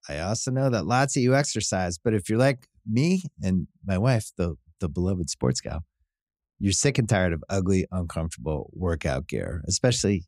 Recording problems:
none

